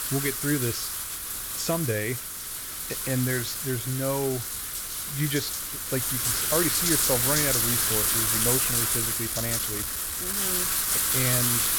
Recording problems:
wind noise on the microphone; heavy; 4 dB above the speech

